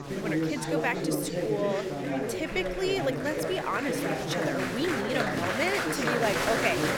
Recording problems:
chatter from many people; very loud; throughout; 1 dB above the speech

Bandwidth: 17 kHz